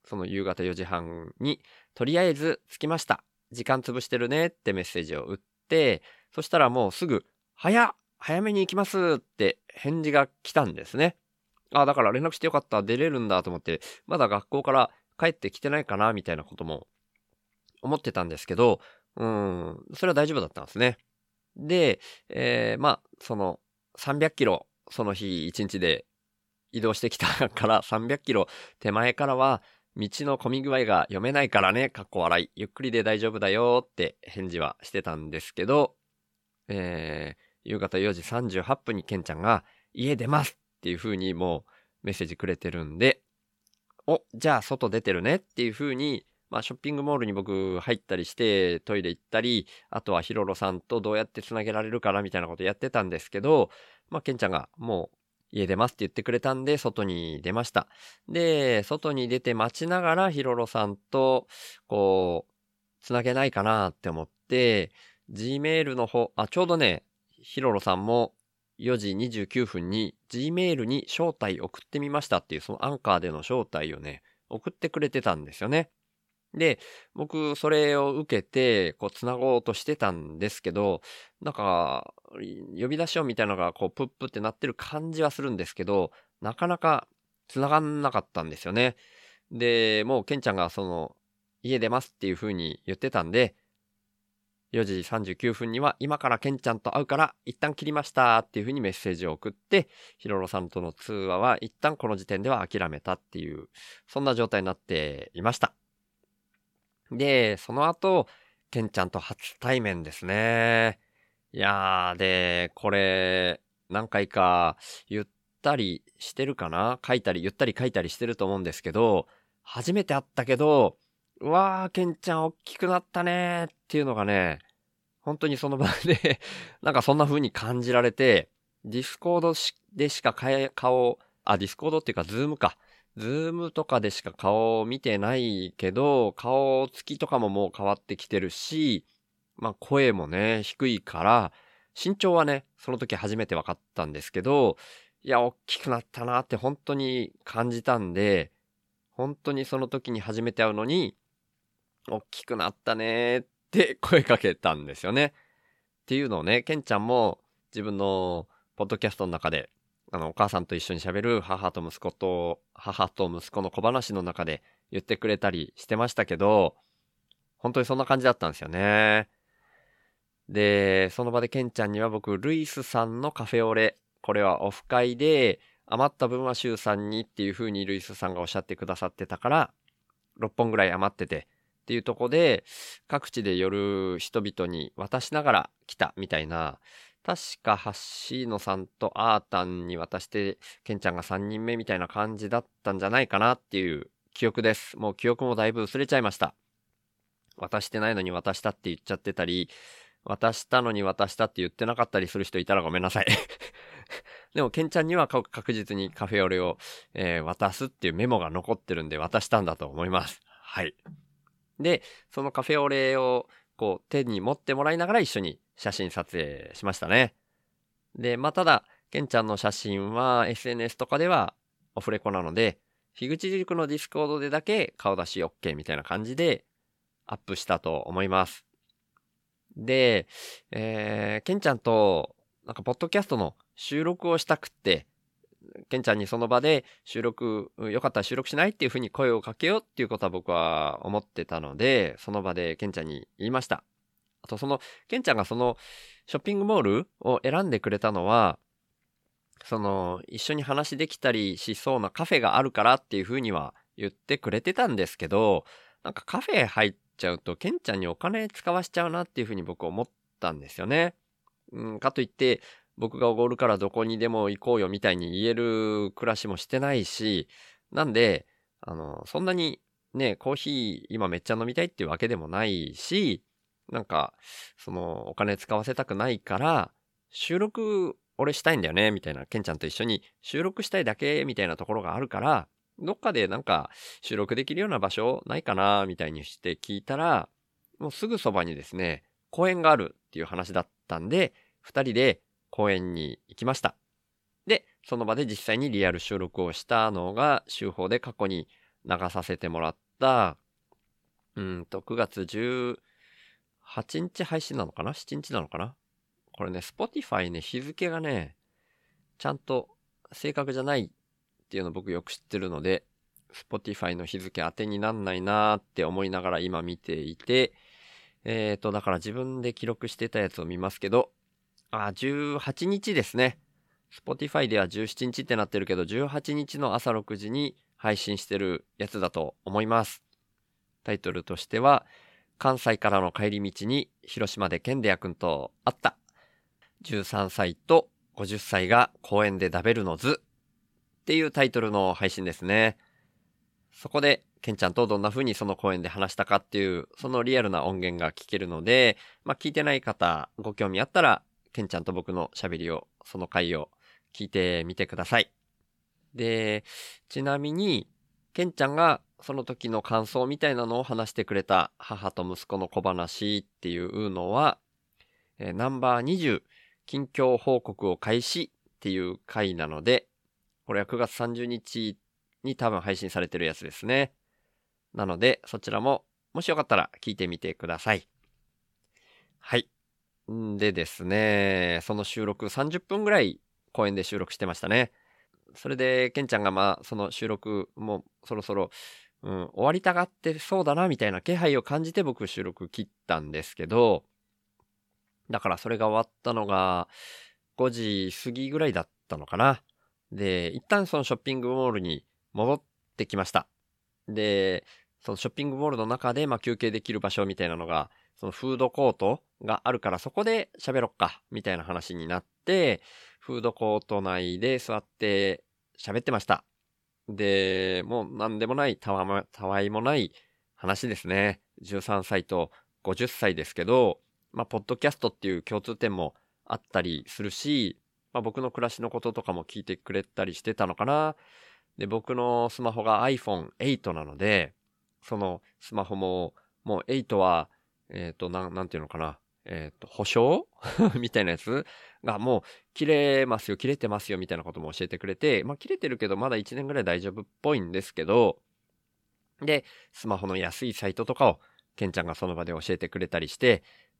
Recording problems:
none

